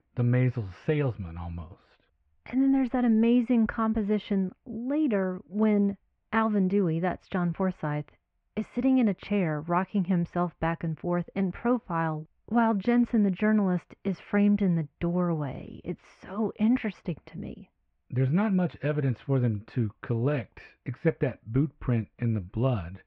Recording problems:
muffled; very; fading above 2.5 kHz

